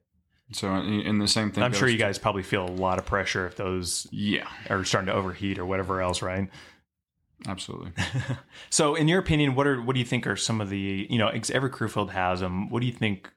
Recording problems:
none

